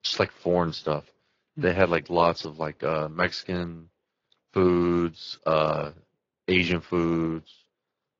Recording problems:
garbled, watery; slightly
high frequencies cut off; slight; nothing above 7.5 kHz

